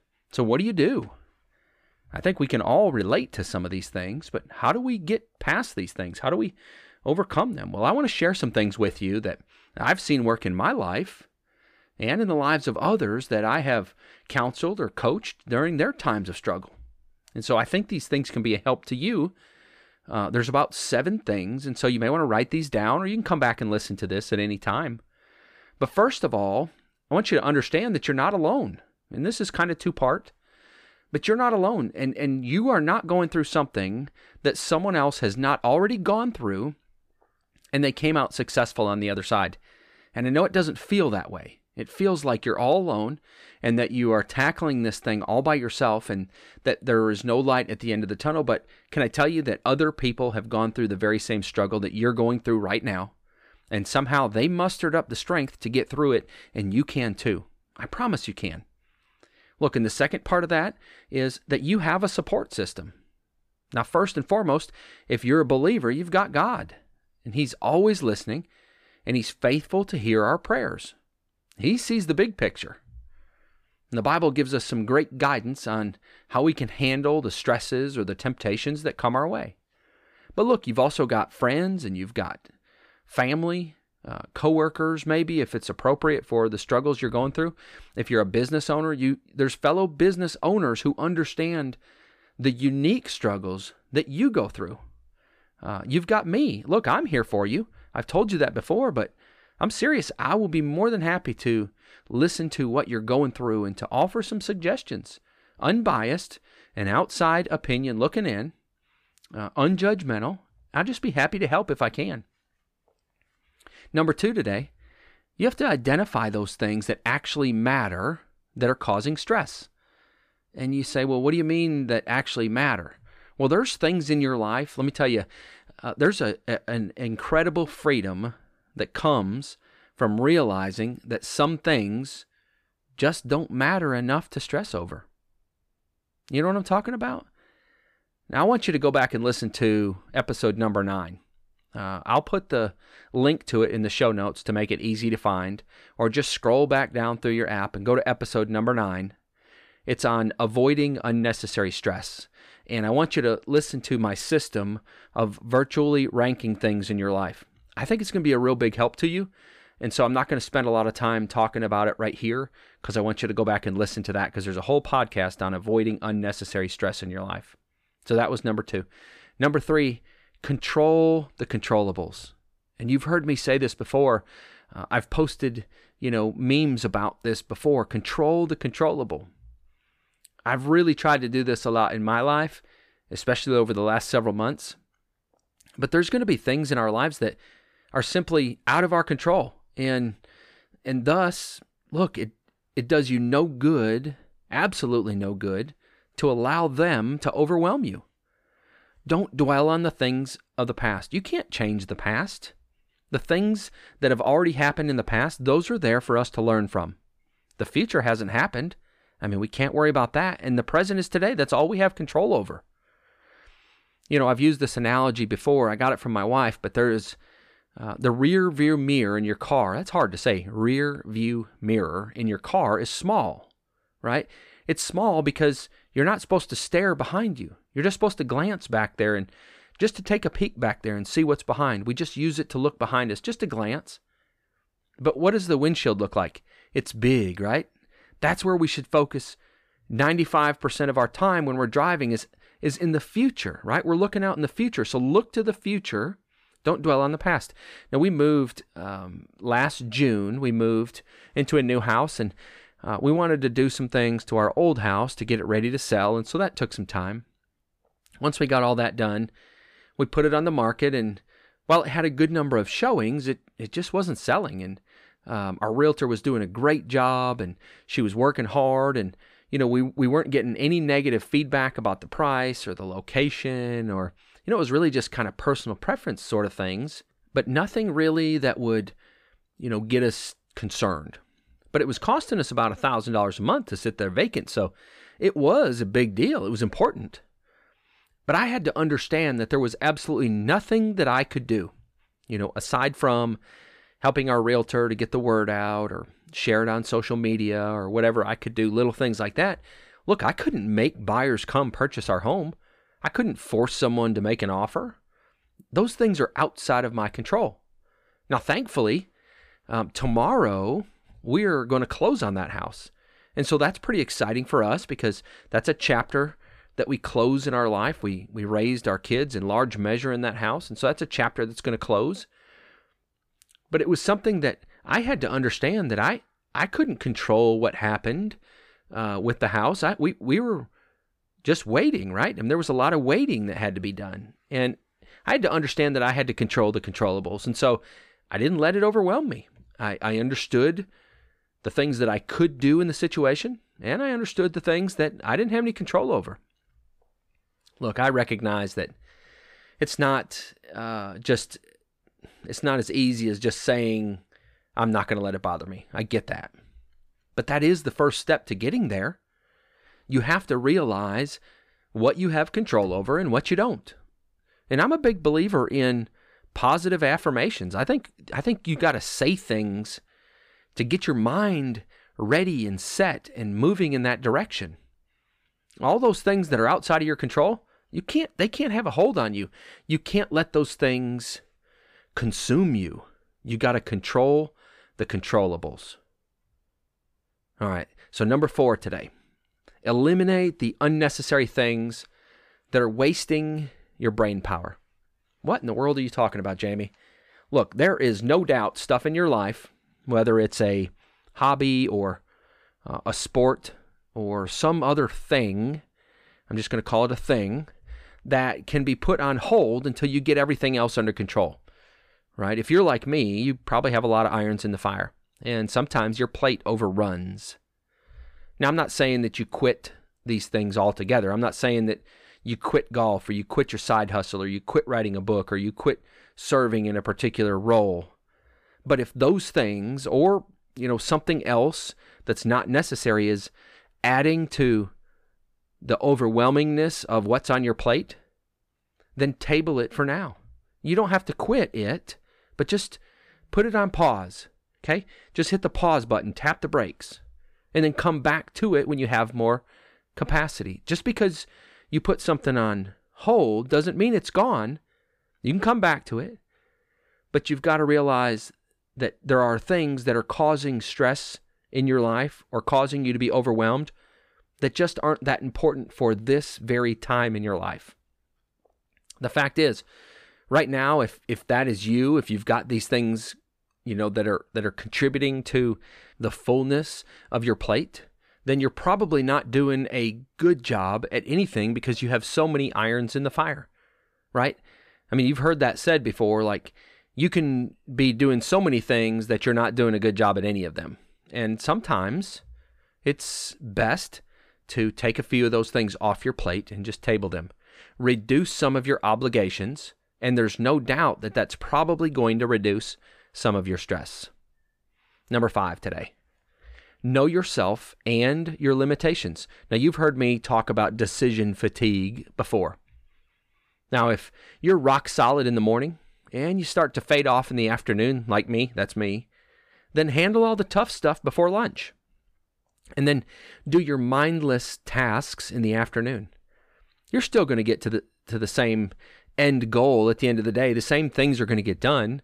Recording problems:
none

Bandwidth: 15 kHz